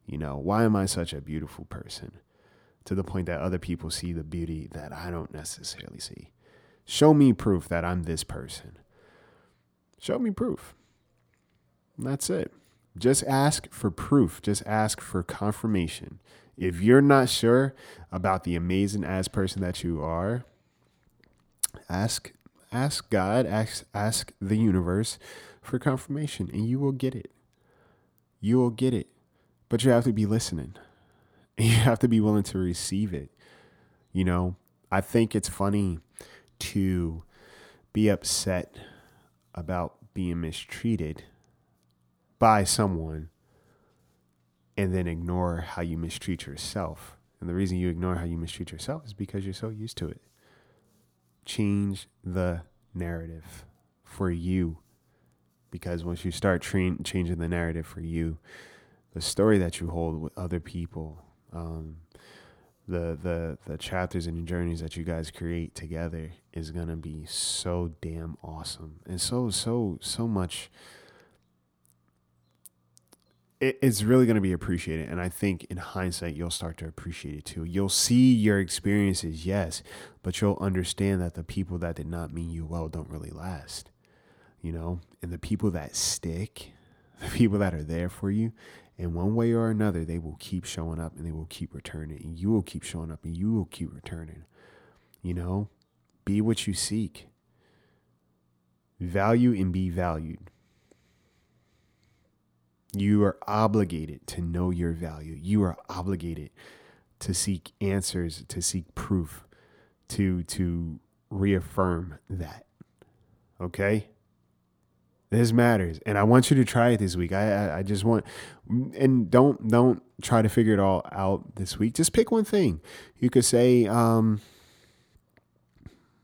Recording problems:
uneven, jittery; strongly; from 4.5 to 36 s

